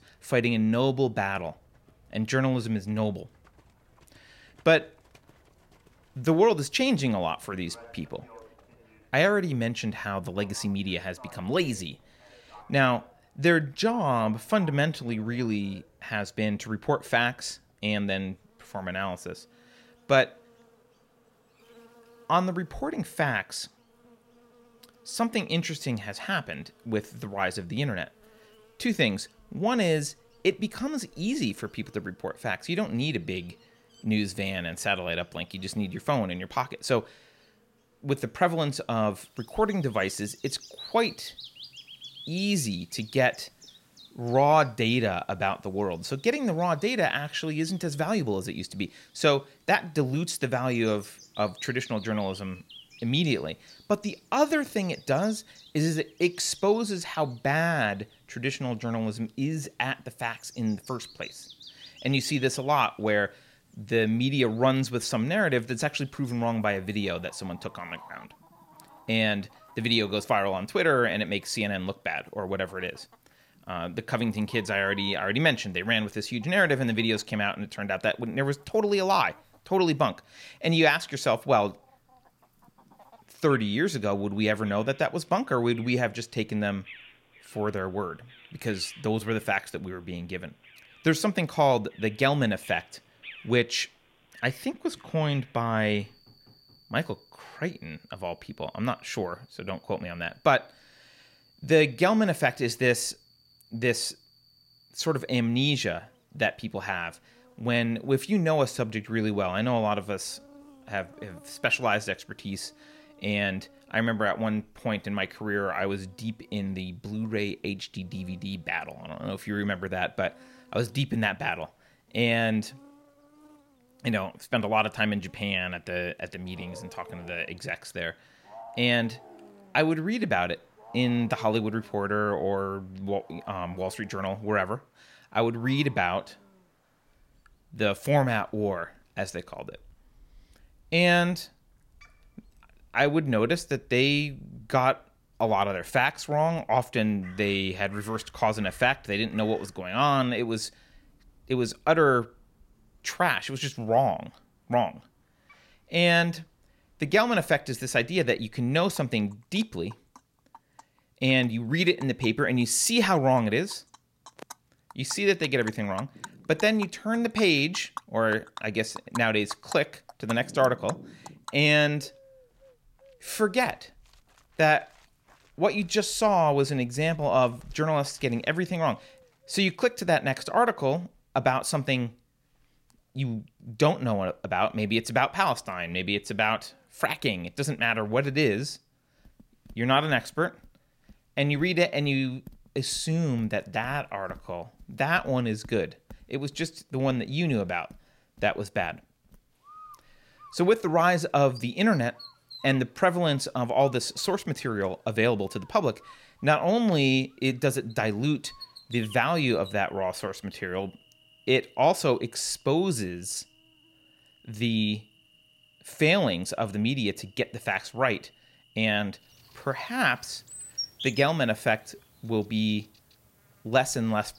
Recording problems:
animal sounds; faint; throughout; 25 dB below the speech

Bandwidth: 16 kHz